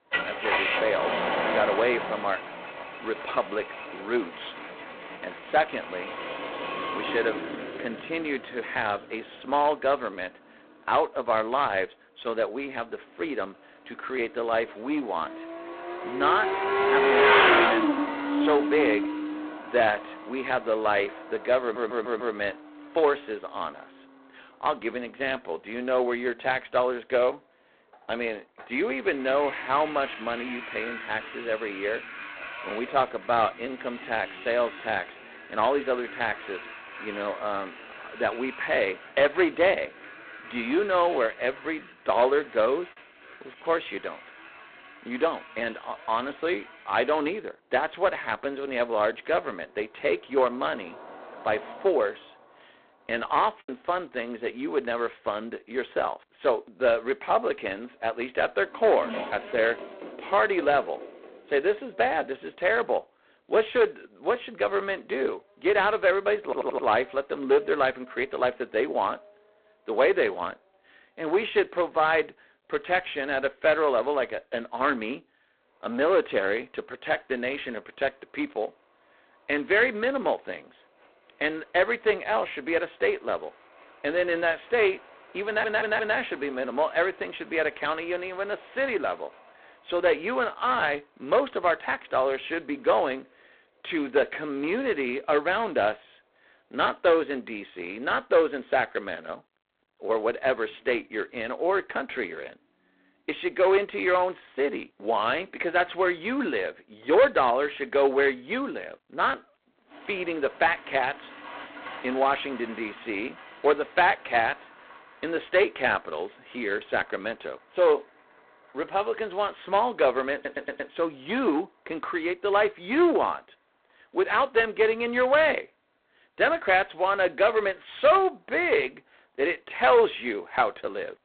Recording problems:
phone-call audio; poor line; nothing above 4 kHz
distortion; slight; 2% of the sound clipped
traffic noise; loud; throughout; 5 dB below the speech
audio stuttering; 4 times, first at 22 s
choppy; occasionally; at 43 s and at 54 s; 2% of the speech affected

